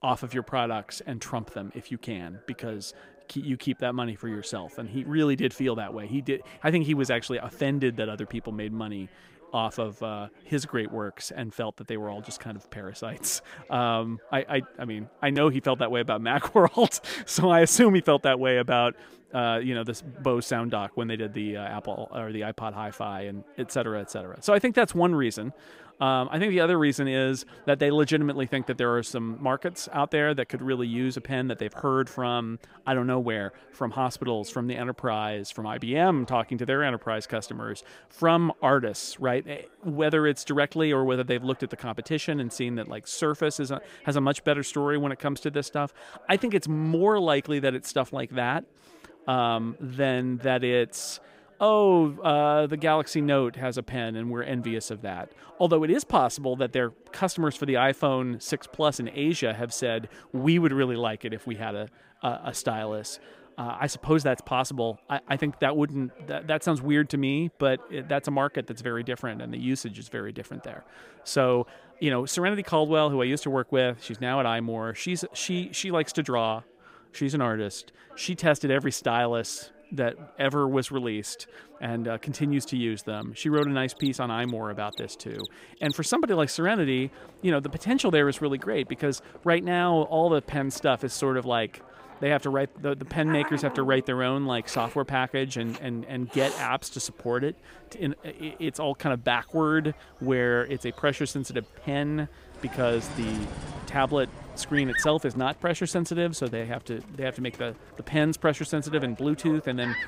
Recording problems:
animal sounds; noticeable; from 1:24 on; 15 dB below the speech
background chatter; faint; throughout; 3 voices, 25 dB below the speech

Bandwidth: 15.5 kHz